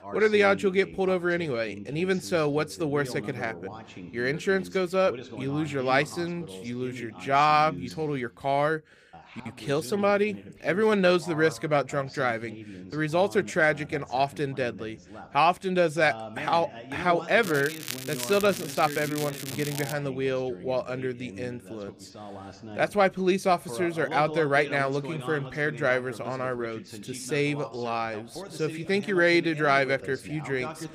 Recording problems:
voice in the background; noticeable; throughout; 15 dB below the speech
crackling; noticeable; from 17 to 20 s; 10 dB below the speech

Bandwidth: 15 kHz